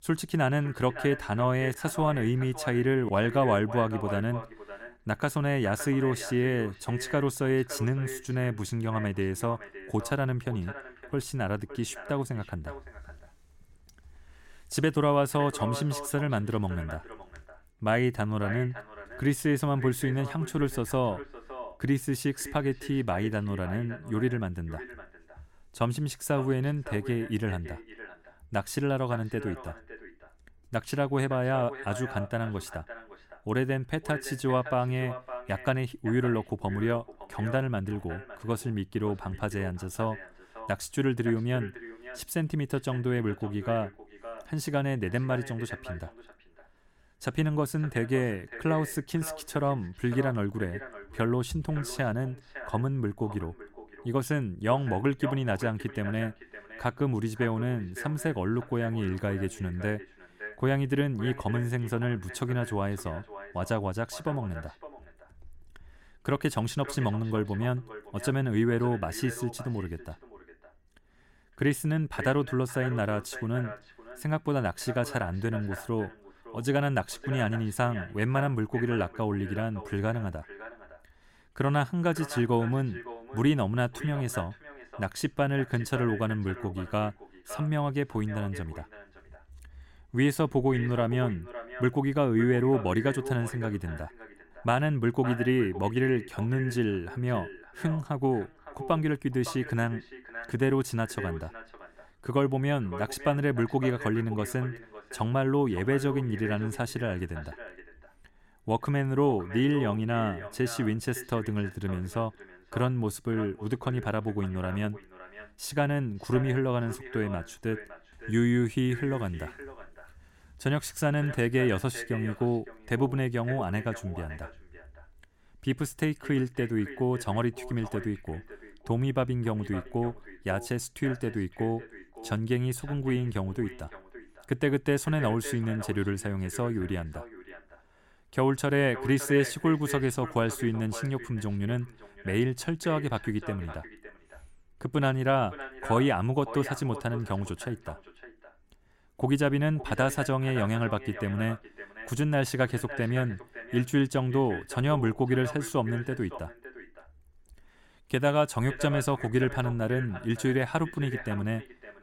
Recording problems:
echo of what is said; noticeable; throughout; 560 ms later, 15 dB below the speech

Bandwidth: 16.5 kHz